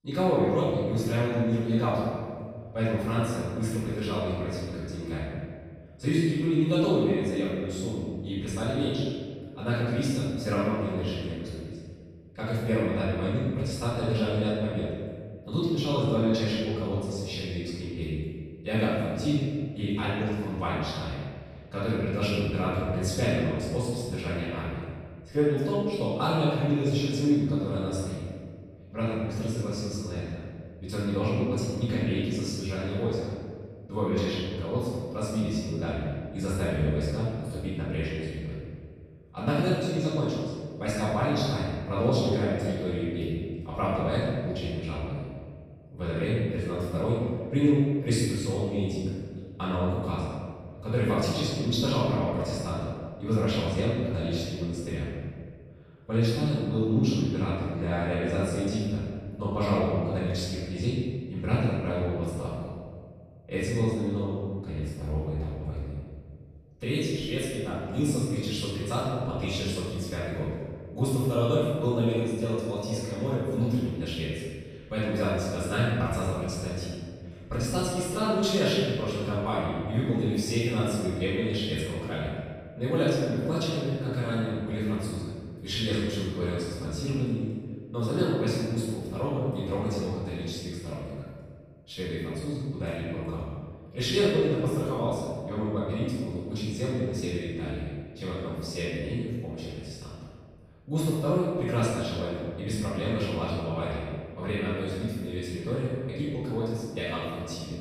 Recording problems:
room echo; strong; dies away in 1.7 s
off-mic speech; far

